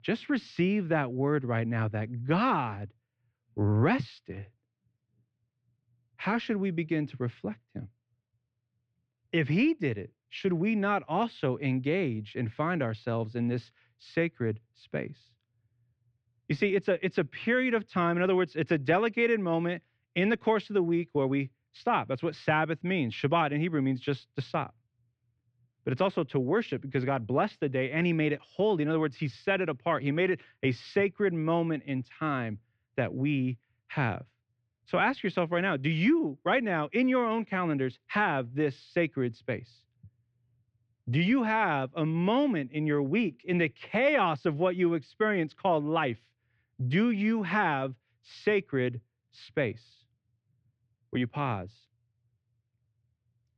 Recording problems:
muffled; slightly; fading above 3.5 kHz

